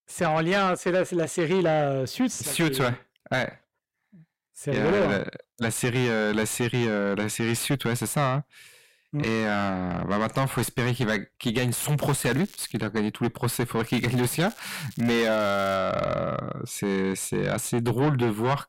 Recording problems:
distortion; heavy; 6 dB below the speech
crackling; faint; at 12 s and from 14 to 16 s; 20 dB below the speech

